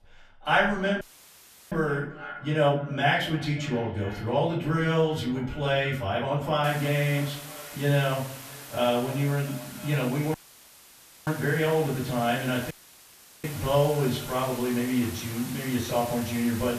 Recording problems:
off-mic speech; far
echo of what is said; faint; throughout; 320 ms later, 20 dB below the speech
room echo; slight; dies away in 0.5 s
hiss; noticeable; from 6.5 s on; 15 dB below the speech
audio cutting out; at 1 s for 0.5 s, at 10 s for 1 s and at 13 s for 0.5 s

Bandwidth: 14.5 kHz